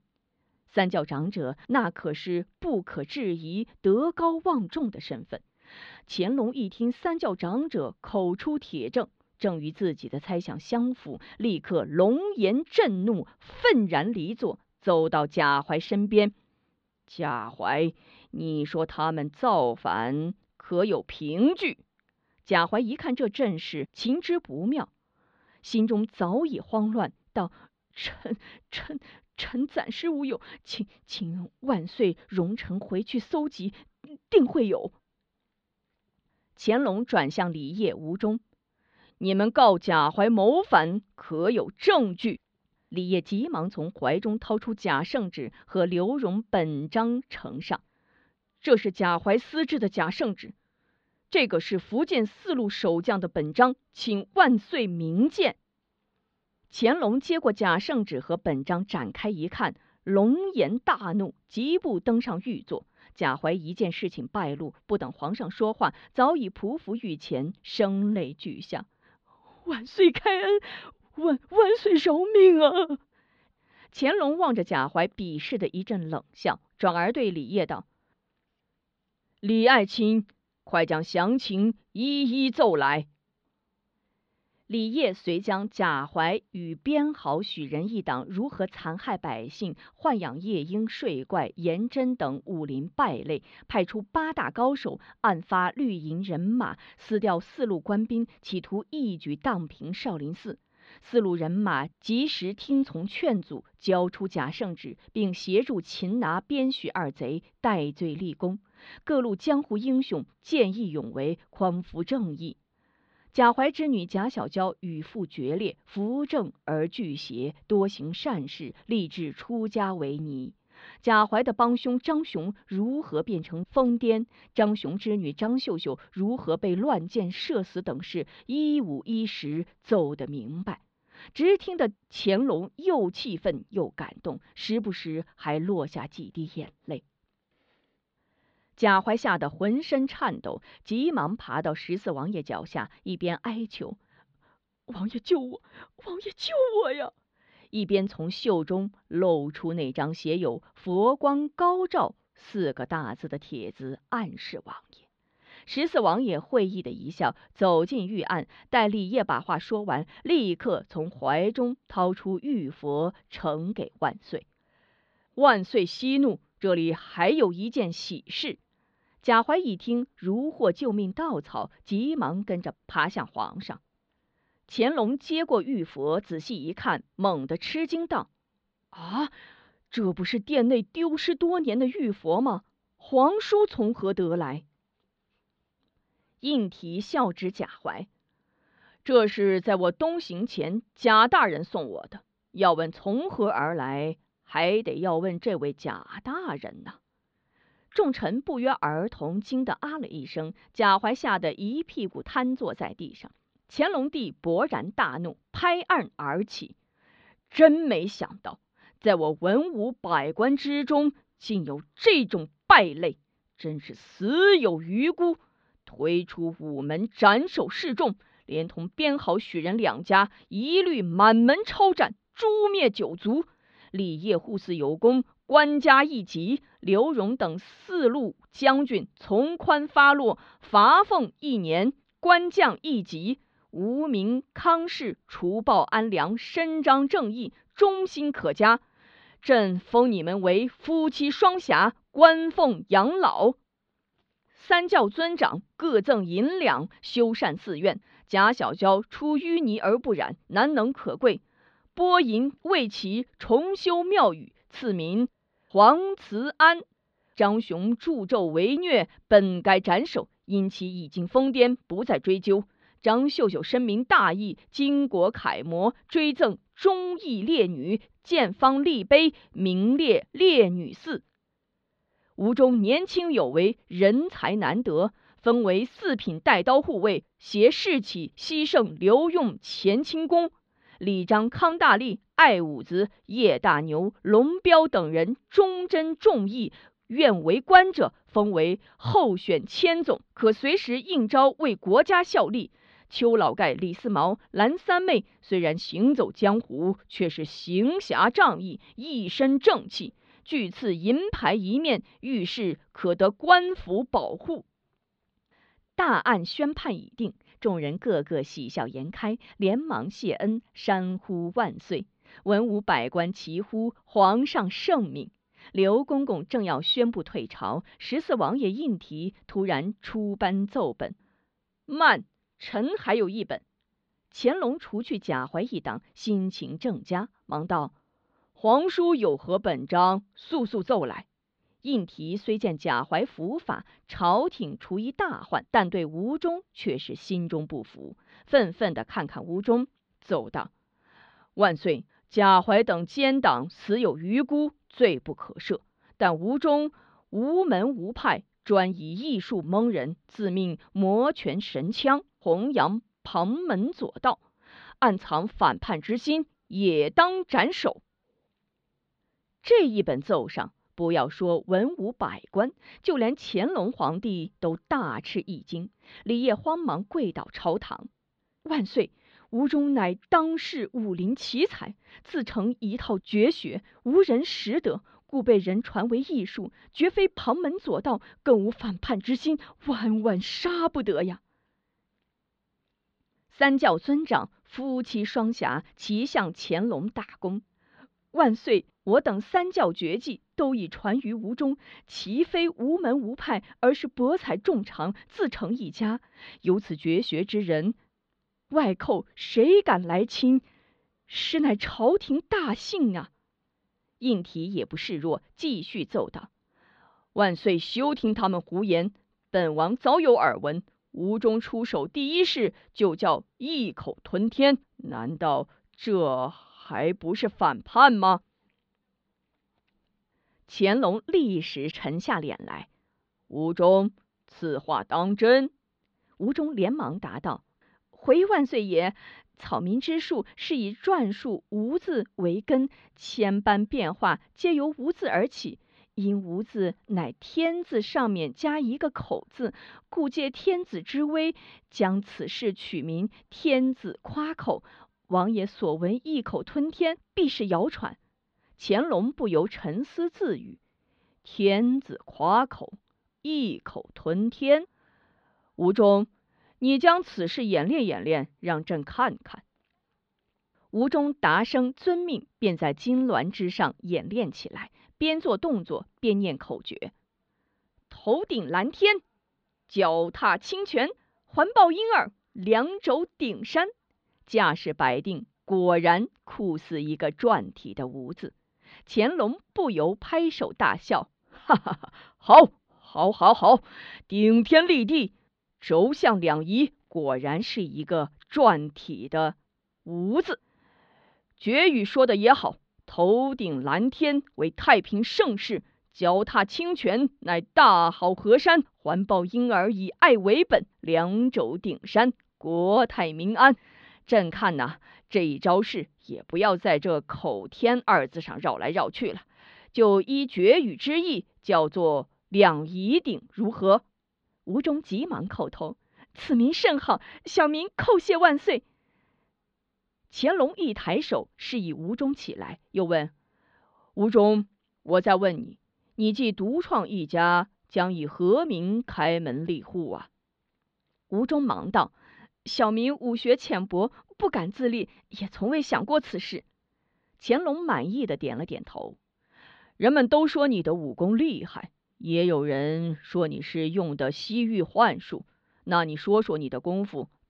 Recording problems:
muffled; slightly; fading above 4 kHz

